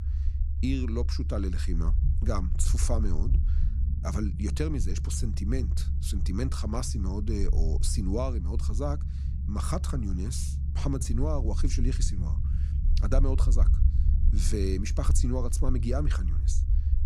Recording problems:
low rumble; noticeable; throughout; 10 dB below the speech

